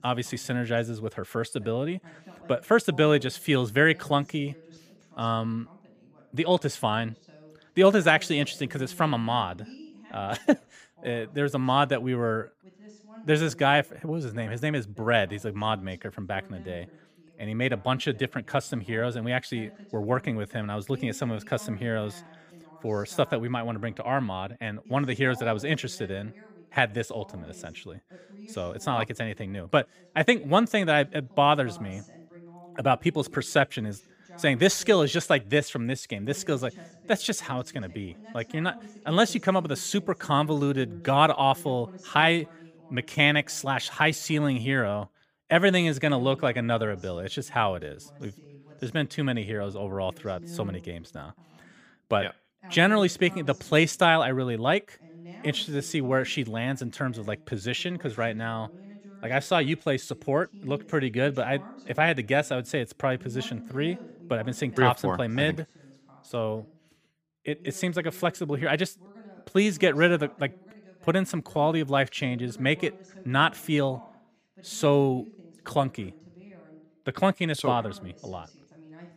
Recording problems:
voice in the background; faint; throughout; 25 dB below the speech

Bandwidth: 15 kHz